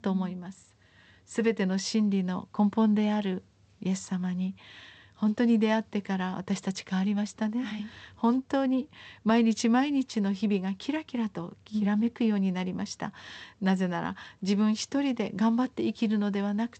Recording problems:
garbled, watery; slightly; nothing above 8 kHz

